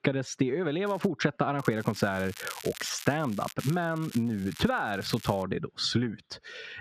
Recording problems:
squashed, flat; heavily
muffled; very slightly; fading above 3.5 kHz
crackling; noticeable; at 1 s, from 1.5 to 3.5 s and from 3.5 to 5.5 s; 15 dB below the speech

